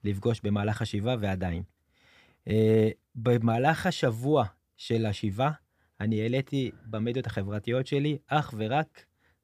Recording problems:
none

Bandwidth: 15 kHz